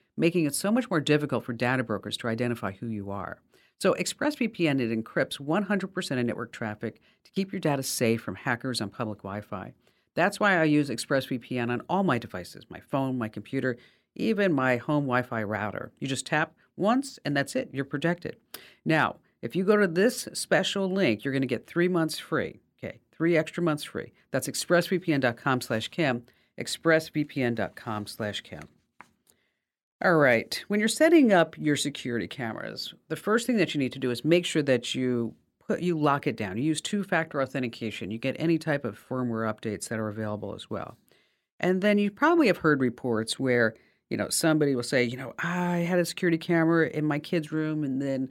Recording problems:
none

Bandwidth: 16.5 kHz